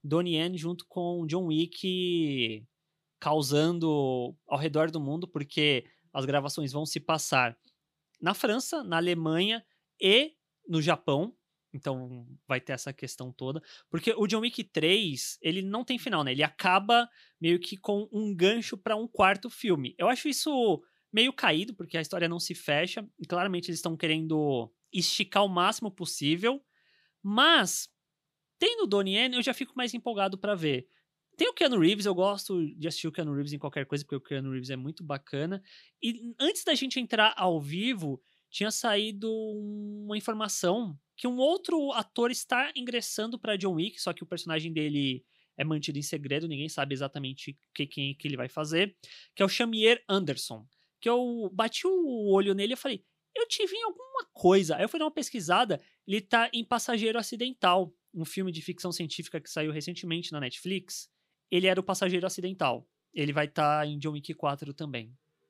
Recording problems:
none

